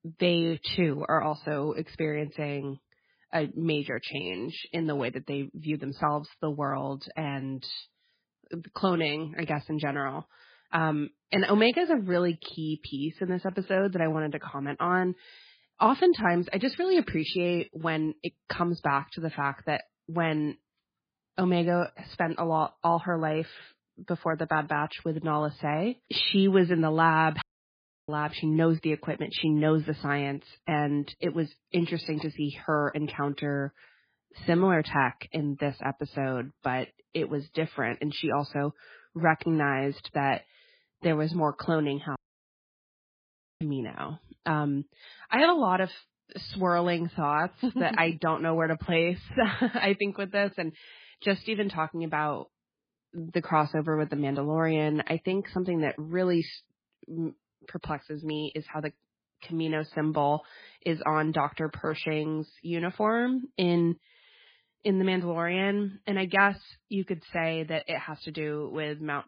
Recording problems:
garbled, watery; badly; nothing above 4 kHz
audio cutting out; at 27 s for 0.5 s and at 42 s for 1.5 s

